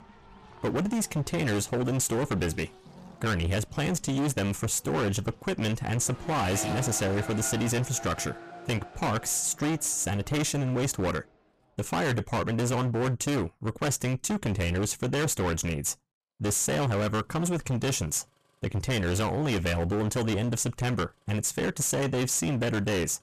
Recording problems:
distortion; heavy; 27% of the sound clipped
traffic noise; noticeable; throughout; 15 dB below the speech

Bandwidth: 14.5 kHz